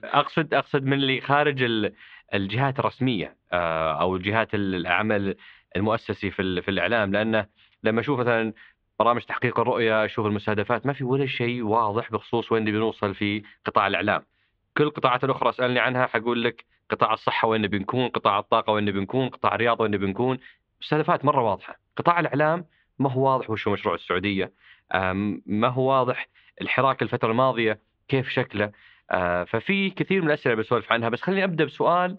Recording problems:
muffled; very; fading above 3.5 kHz

